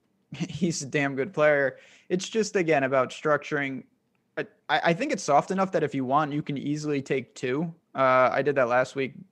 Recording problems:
none

